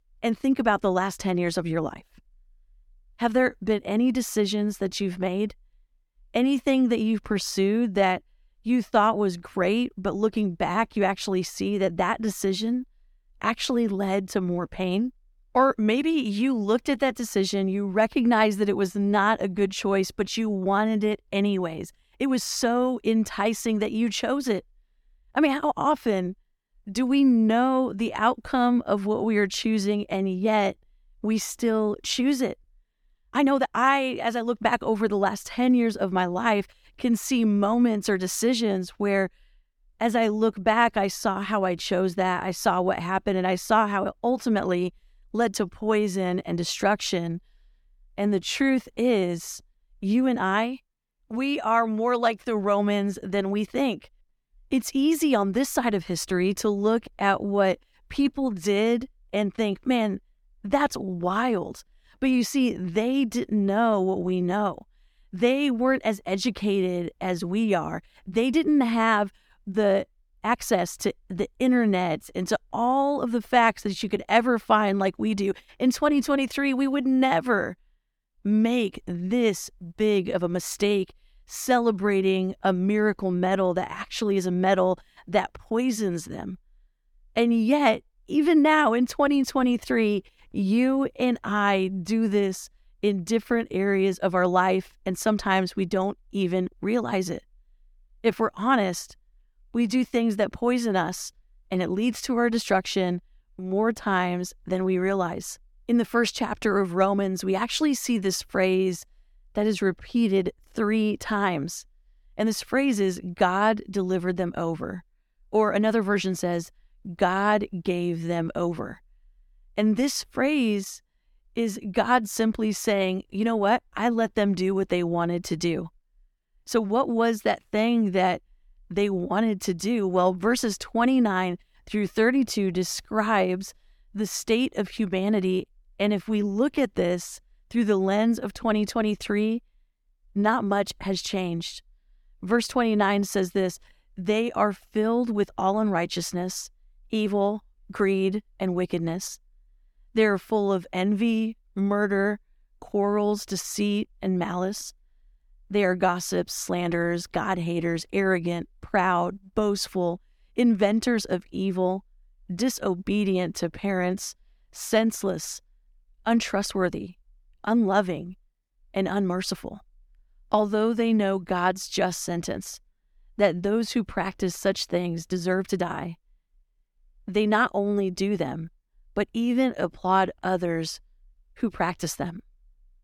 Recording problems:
uneven, jittery; strongly; from 22 s to 2:56

